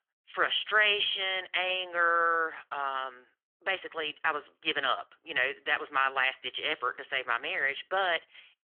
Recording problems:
thin; very; fading below 500 Hz
phone-call audio; nothing above 3.5 kHz

